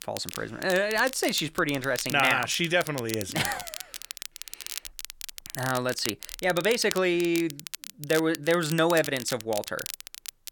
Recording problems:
crackle, like an old record; noticeable; 10 dB below the speech

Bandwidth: 17.5 kHz